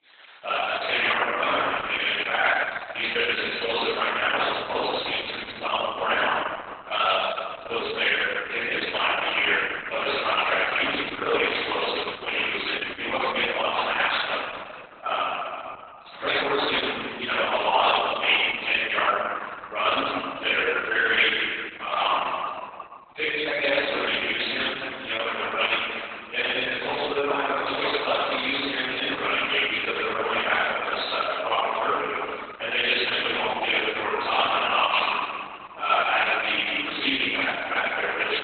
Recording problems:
room echo; strong; dies away in 2.1 s
off-mic speech; far
garbled, watery; badly; nothing above 4 kHz
thin; very; fading below 750 Hz

